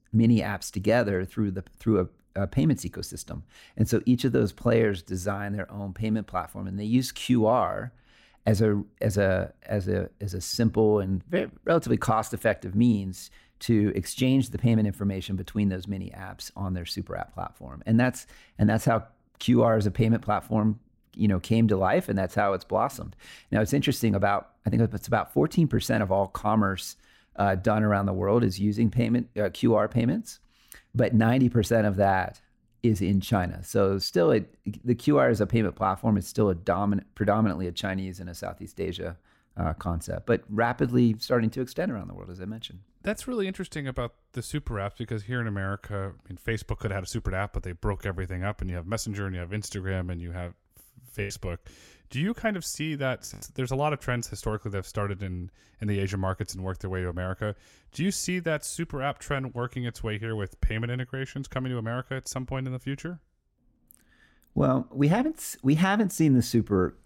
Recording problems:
choppy; very; from 51 to 53 s; 11% of the speech affected

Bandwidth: 16 kHz